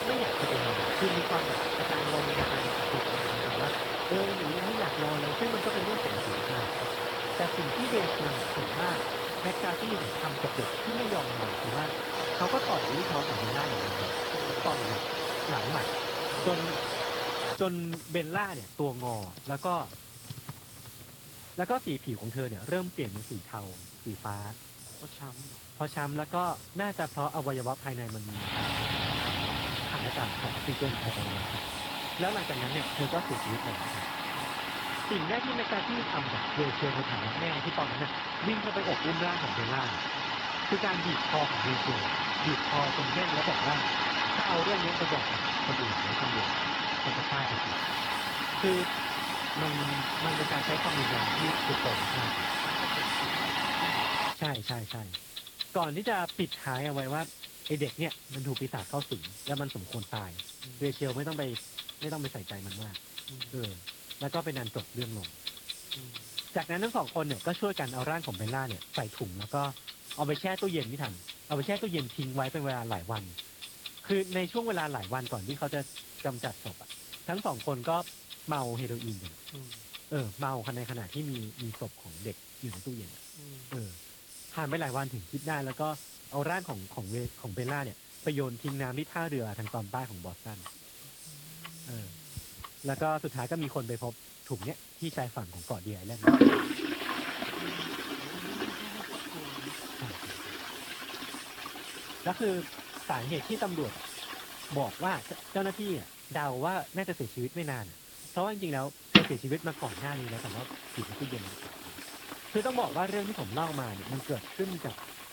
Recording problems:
garbled, watery; slightly
household noises; very loud; throughout; 4 dB above the speech
hiss; noticeable; until 35 s and from 48 s on; 10 dB below the speech

